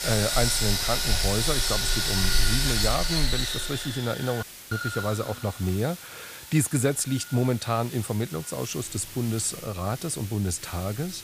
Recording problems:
machinery noise; very loud; throughout; 2 dB above the speech
hiss; noticeable; throughout; 10 dB below the speech
audio cutting out; at 4.5 s

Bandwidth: 15 kHz